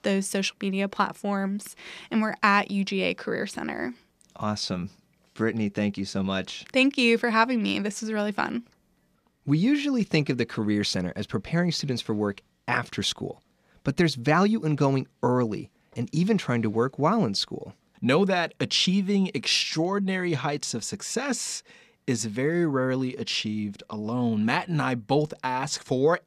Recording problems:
none

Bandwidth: 14.5 kHz